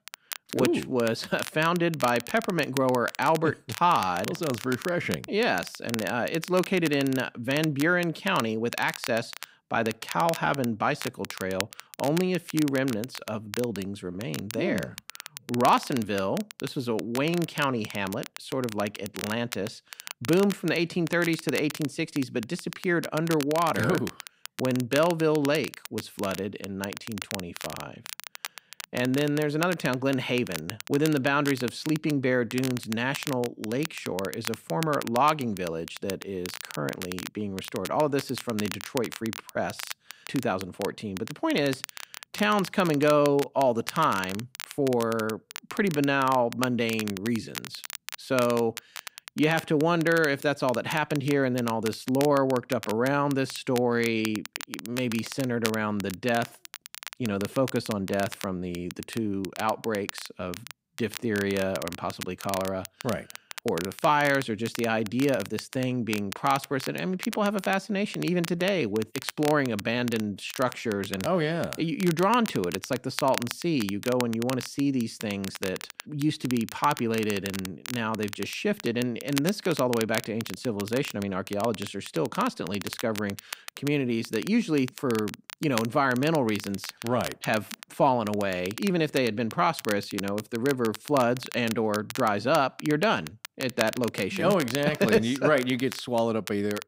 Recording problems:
crackle, like an old record; noticeable; 10 dB below the speech

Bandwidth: 15.5 kHz